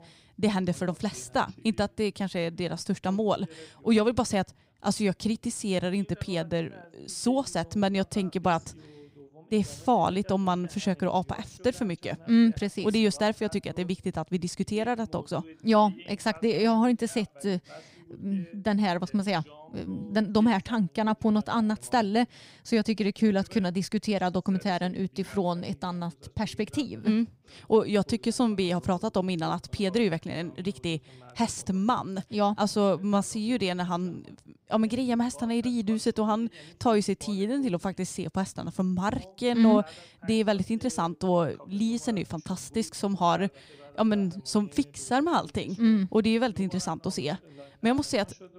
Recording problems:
voice in the background; faint; throughout; 25 dB below the speech

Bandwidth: 15.5 kHz